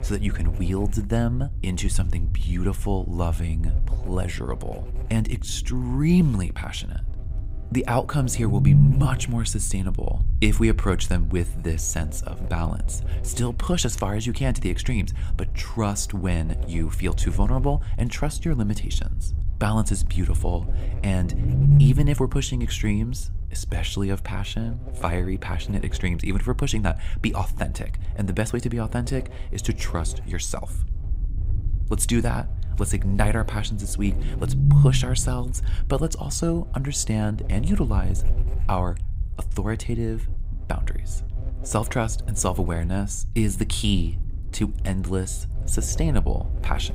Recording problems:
low rumble; loud; throughout; 10 dB below the speech
electrical hum; noticeable; throughout; 60 Hz, 20 dB below the speech

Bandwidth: 15.5 kHz